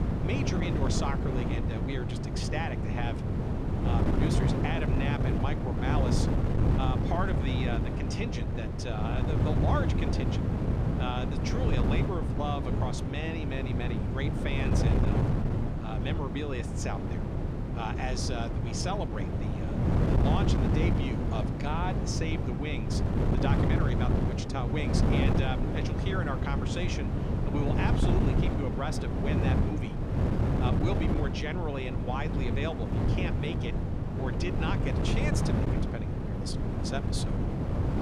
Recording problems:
wind noise on the microphone; heavy; as loud as the speech

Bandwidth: 13.5 kHz